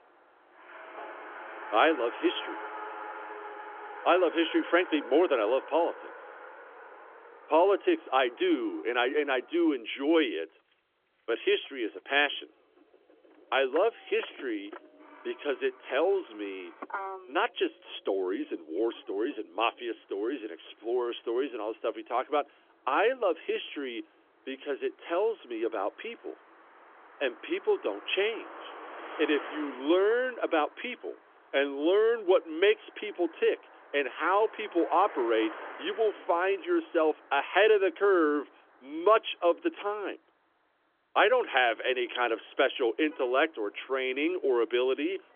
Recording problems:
phone-call audio; nothing above 3.5 kHz
traffic noise; noticeable; throughout; 15 dB below the speech

